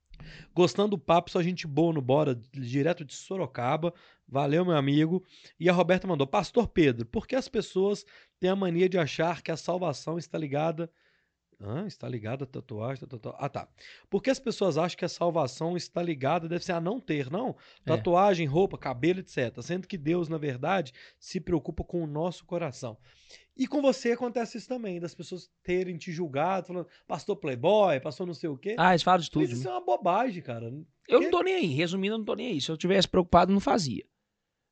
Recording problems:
high frequencies cut off; noticeable; nothing above 8 kHz

